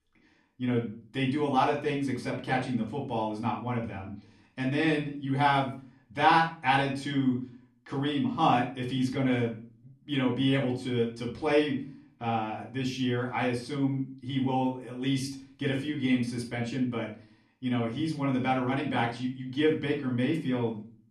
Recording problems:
off-mic speech; far
room echo; slight; dies away in 0.4 s

